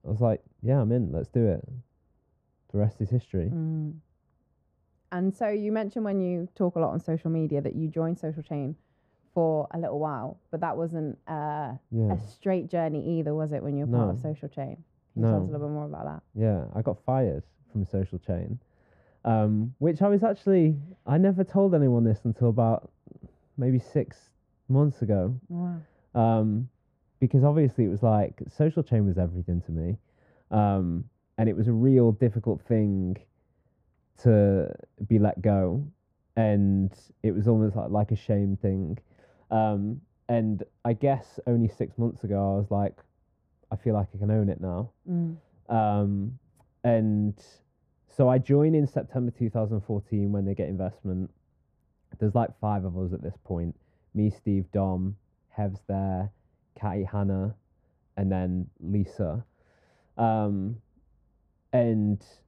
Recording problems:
muffled; very; fading above 1.5 kHz

